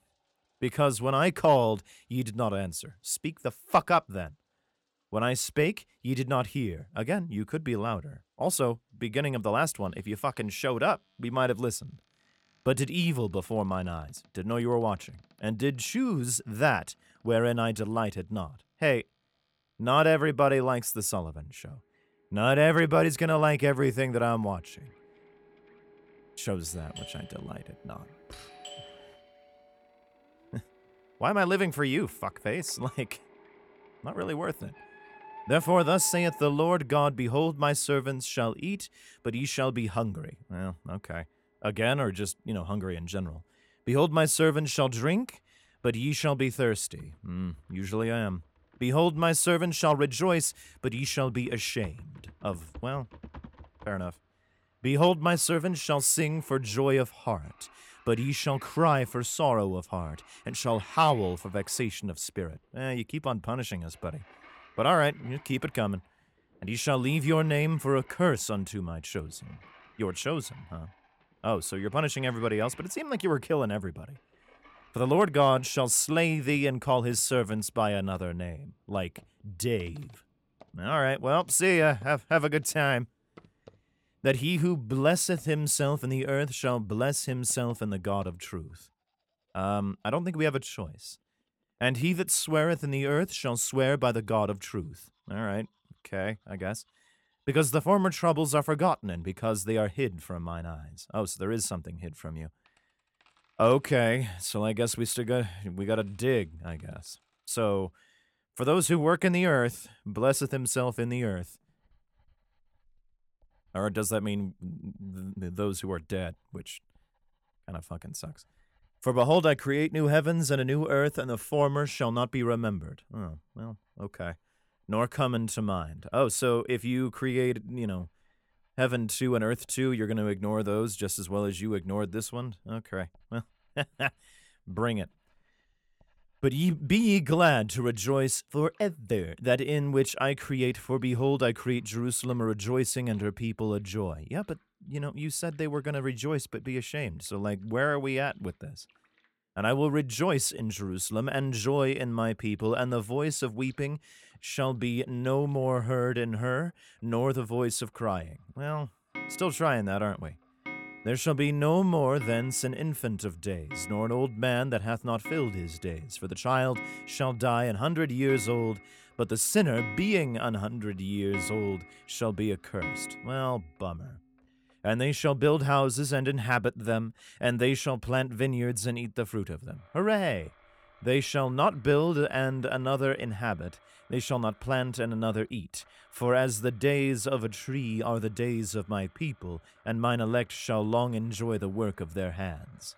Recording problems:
household noises; noticeable; throughout; 20 dB below the speech
doorbell; faint; from 27 to 29 s; peak 15 dB below the speech

